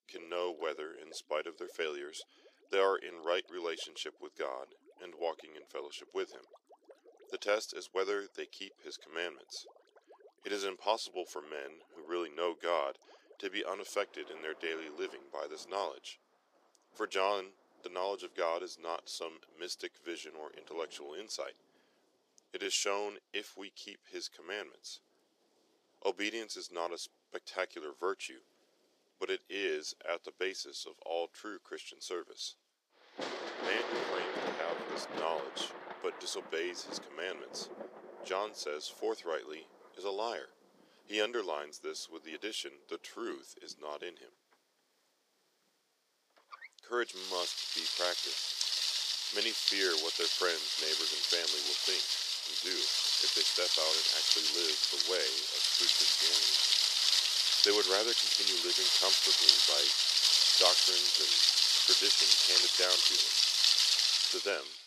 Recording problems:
thin; very; fading below 400 Hz
rain or running water; very loud; throughout; 10 dB above the speech

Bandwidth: 15 kHz